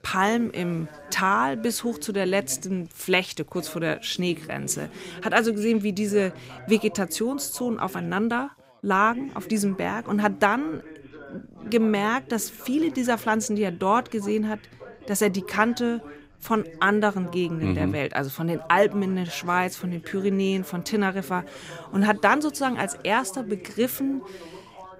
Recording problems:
background chatter; noticeable; throughout; 3 voices, 20 dB below the speech

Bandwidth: 15.5 kHz